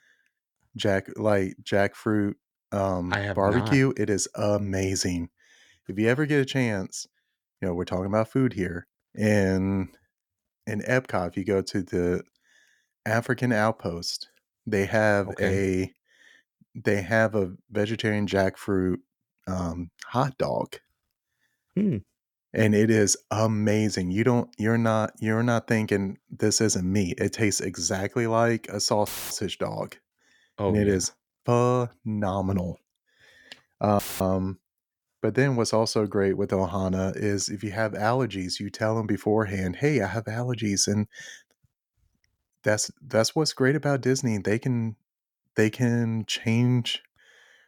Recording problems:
audio cutting out; filled with static; at 29 s and at 34 s

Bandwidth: 18.5 kHz